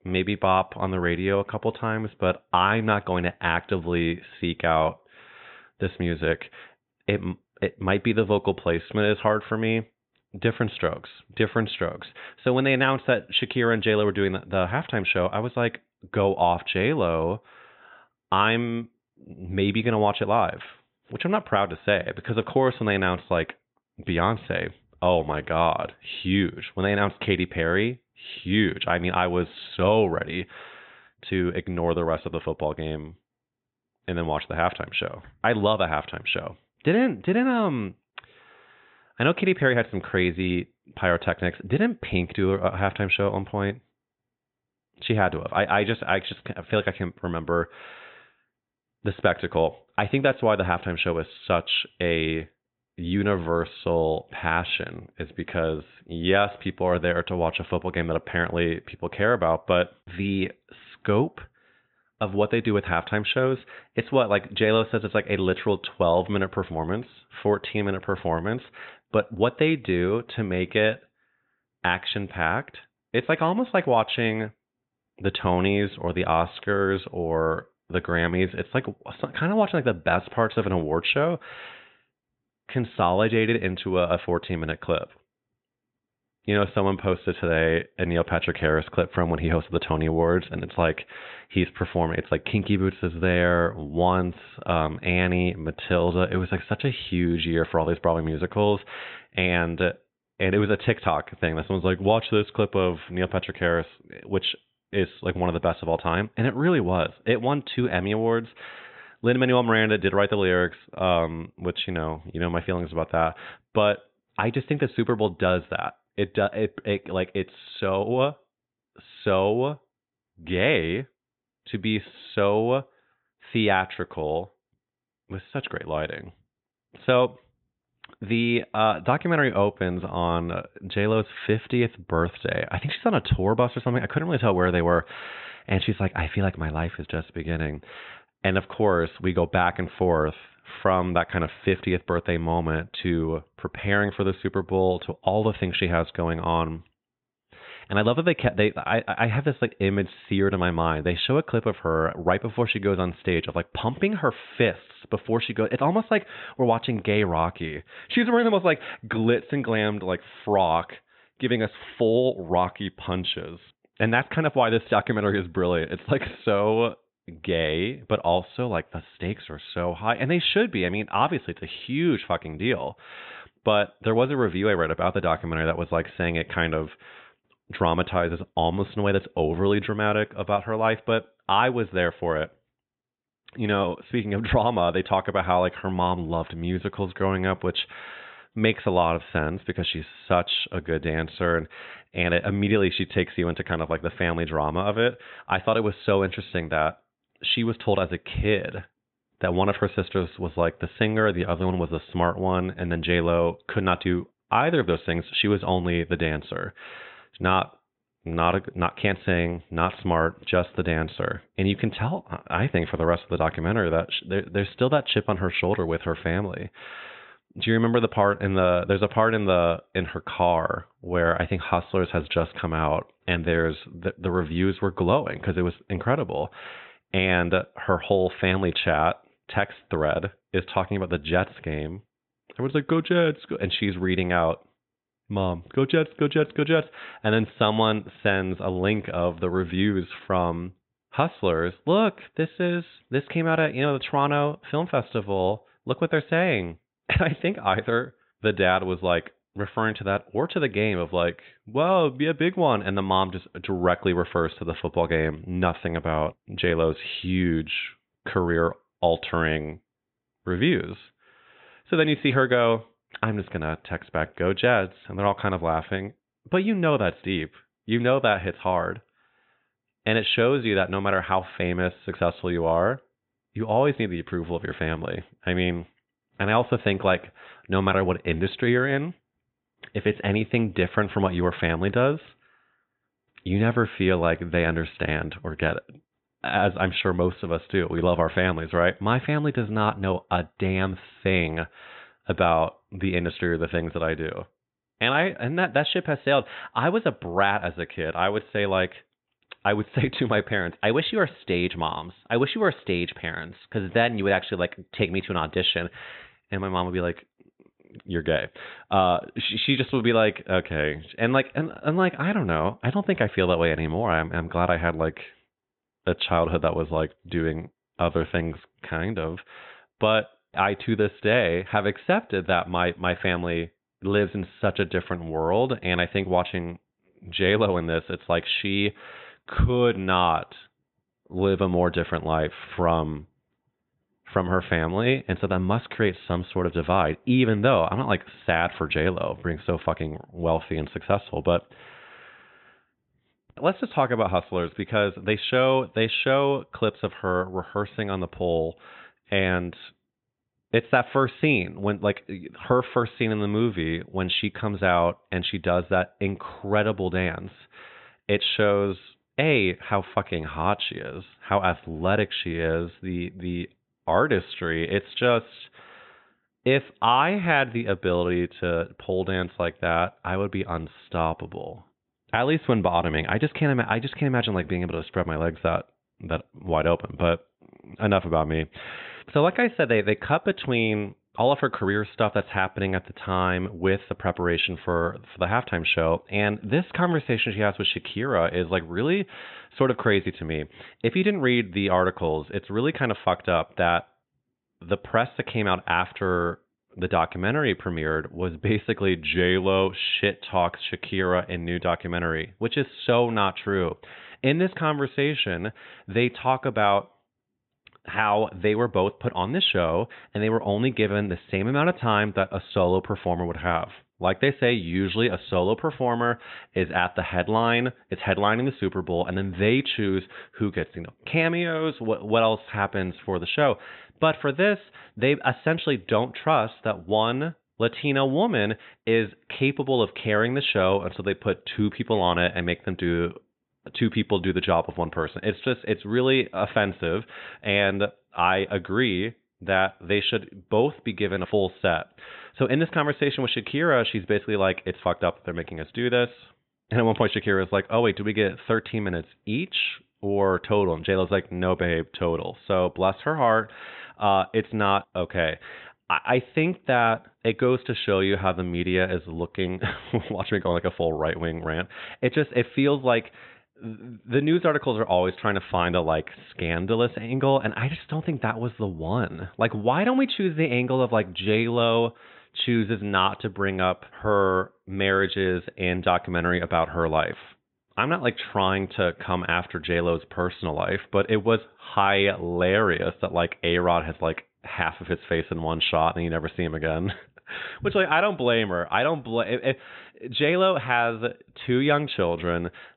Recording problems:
high frequencies cut off; severe; nothing above 3.5 kHz

